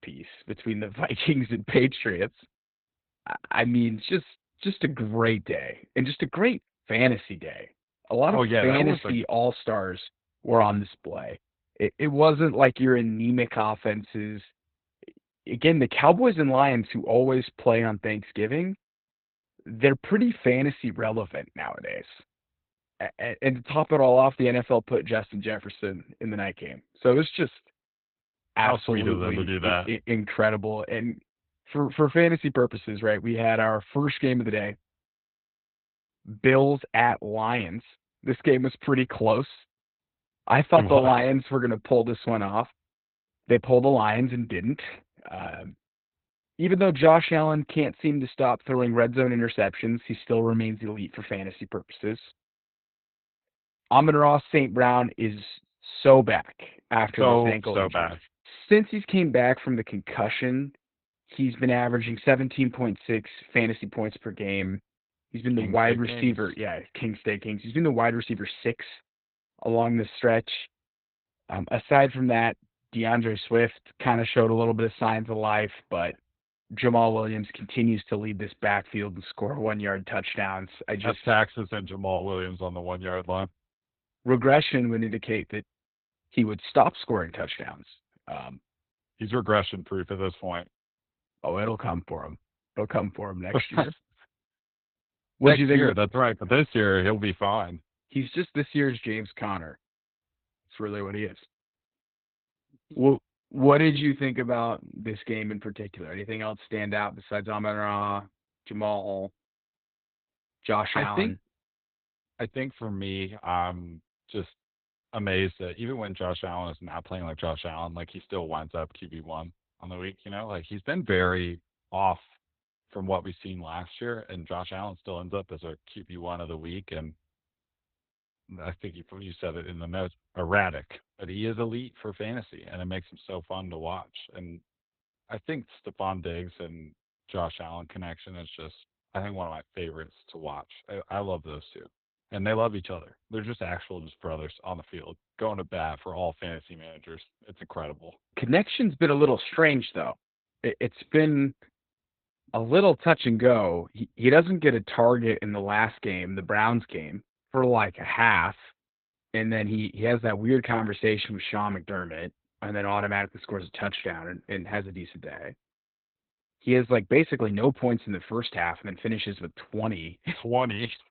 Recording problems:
garbled, watery; badly; nothing above 4 kHz

